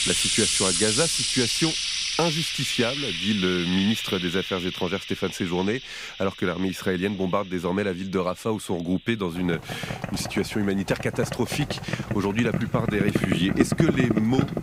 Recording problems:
household noises; very loud; throughout; as loud as the speech

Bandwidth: 15.5 kHz